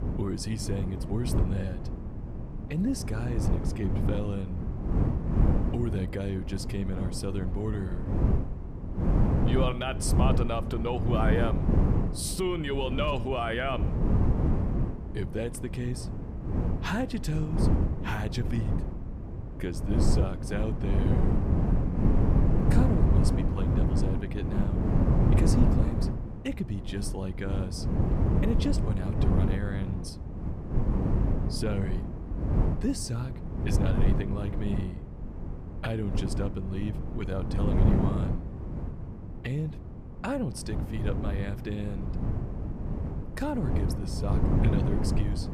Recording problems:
wind noise on the microphone; heavy; 2 dB below the speech

